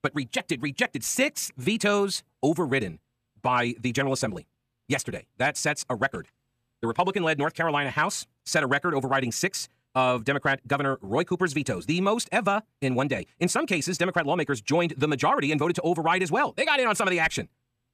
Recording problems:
wrong speed, natural pitch; too fast; 1.5 times normal speed

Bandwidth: 14.5 kHz